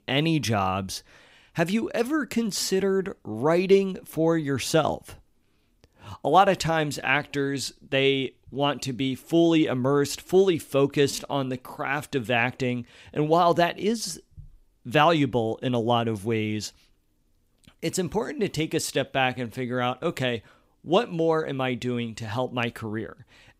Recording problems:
none

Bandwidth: 15.5 kHz